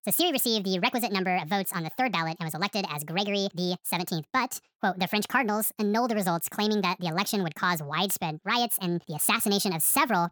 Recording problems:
wrong speed and pitch; too fast and too high; 1.6 times normal speed

